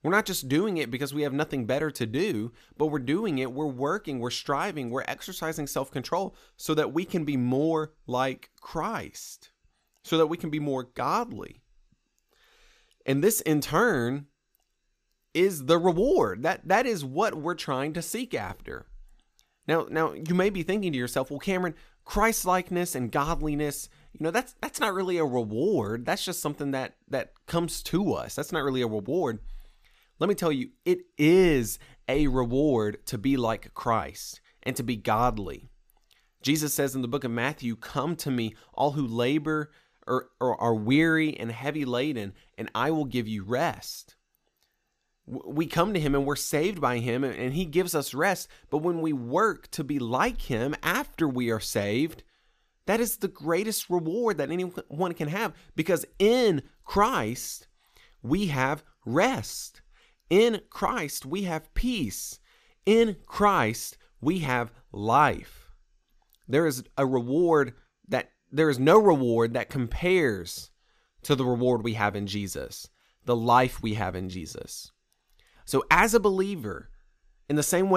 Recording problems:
abrupt cut into speech; at the end

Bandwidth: 14.5 kHz